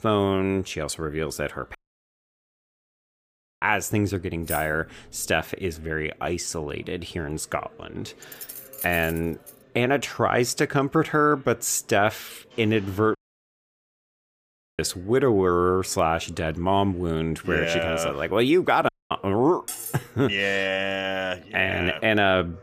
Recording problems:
chatter from many people; faint; throughout; 30 dB below the speech
audio cutting out; at 2 s for 2 s, at 13 s for 1.5 s and at 19 s
jangling keys; noticeable; at 4.5 s and from 8 to 9.5 s; peak 9 dB below the speech
clattering dishes; noticeable; at 20 s; peak 8 dB below the speech

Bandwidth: 15 kHz